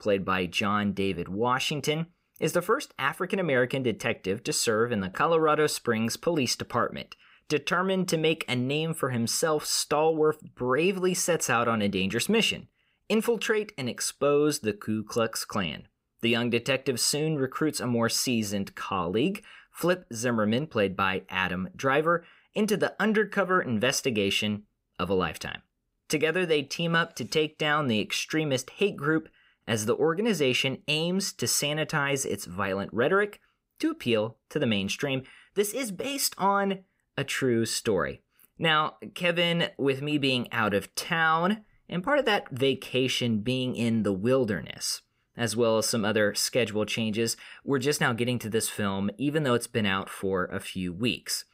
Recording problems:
none

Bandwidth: 15.5 kHz